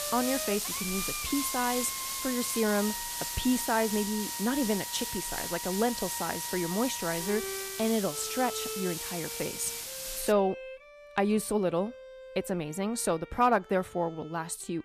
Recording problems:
hiss; loud; until 10 s; 3 dB below the speech
background music; noticeable; throughout; 10 dB below the speech

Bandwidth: 14.5 kHz